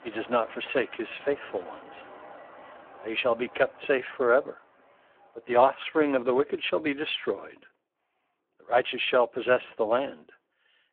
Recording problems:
phone-call audio; poor line; nothing above 3.5 kHz
traffic noise; faint; throughout; 20 dB below the speech

